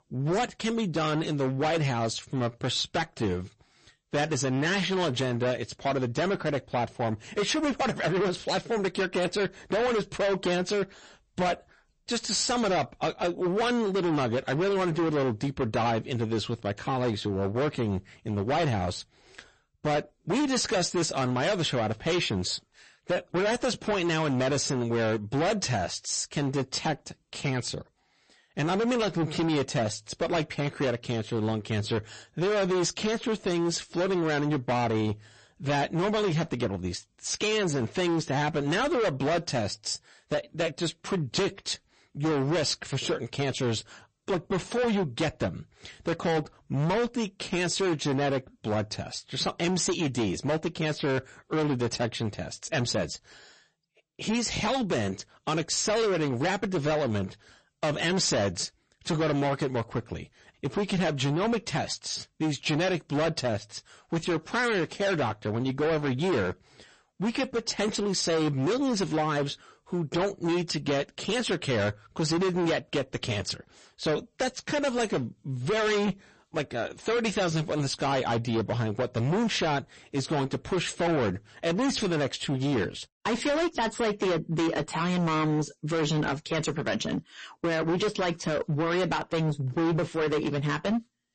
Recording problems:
distortion; heavy; 19% of the sound clipped
garbled, watery; slightly; nothing above 8 kHz

